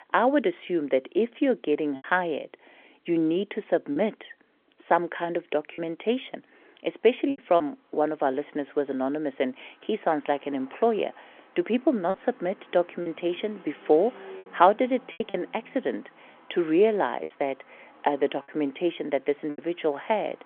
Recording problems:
phone-call audio; nothing above 3.5 kHz
traffic noise; faint; throughout; 25 dB below the speech
choppy; occasionally; 4% of the speech affected

